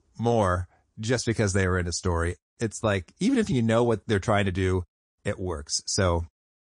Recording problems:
garbled, watery; slightly; nothing above 9 kHz

